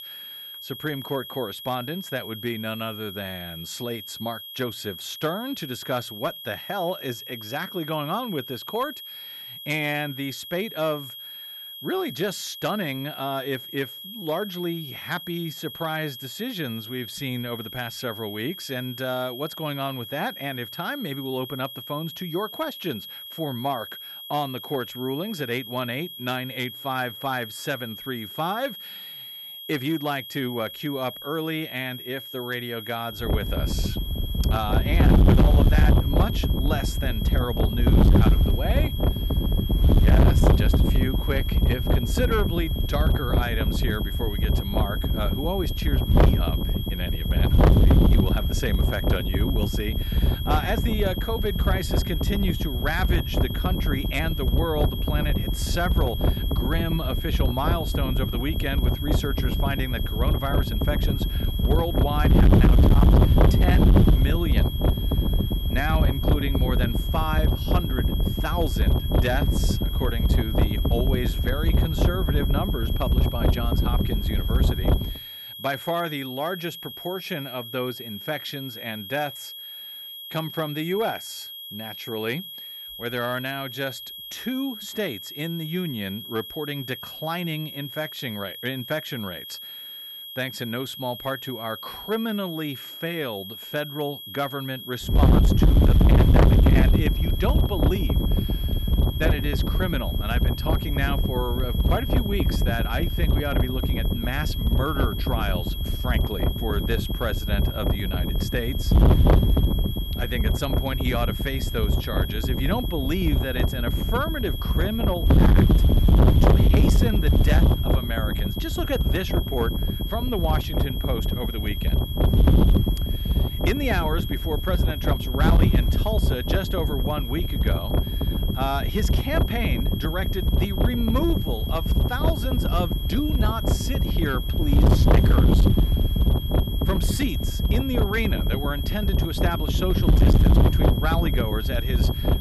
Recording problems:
distortion; slight; 4% of the sound clipped
wind noise on the microphone; heavy; from 33 s to 1:15 and from 1:35 on; 2 dB below the speech
high-pitched whine; loud; throughout; 3.5 kHz, 5 dB below the speech

